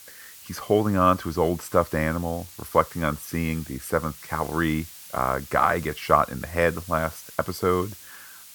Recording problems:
hiss; noticeable; throughout; 15 dB below the speech

